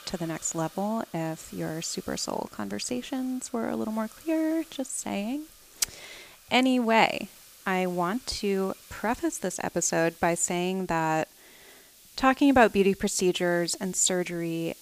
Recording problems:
hiss; faint; throughout; 20 dB below the speech

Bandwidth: 15 kHz